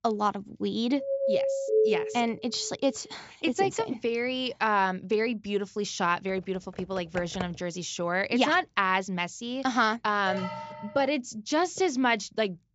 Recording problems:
high frequencies cut off; noticeable; nothing above 8 kHz
doorbell; loud; from 1 to 2 s; peak 4 dB above the speech
keyboard typing; faint; from 6.5 to 7.5 s; peak 10 dB below the speech
alarm; noticeable; at 10 s; peak 6 dB below the speech

